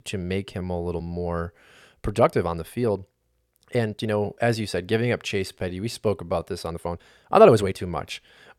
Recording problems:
uneven, jittery; strongly; from 0.5 to 8 s

